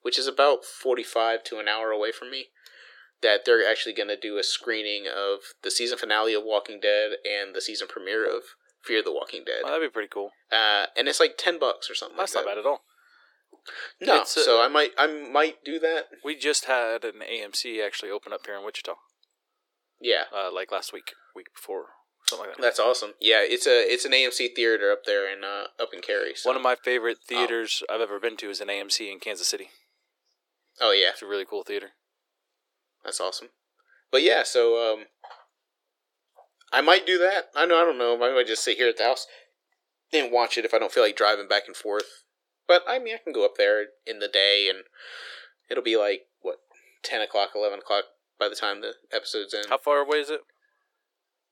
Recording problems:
thin; very; fading below 350 Hz

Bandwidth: 18 kHz